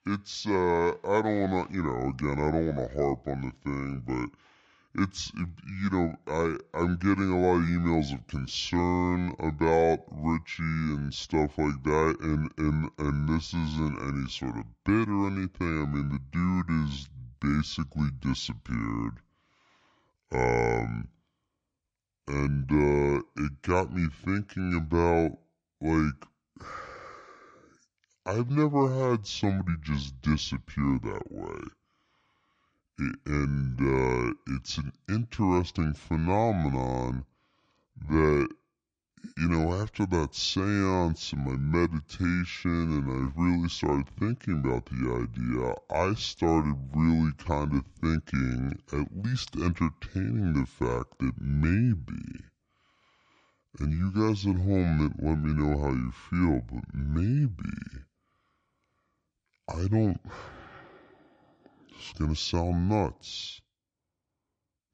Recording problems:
wrong speed and pitch; too slow and too low; 0.6 times normal speed

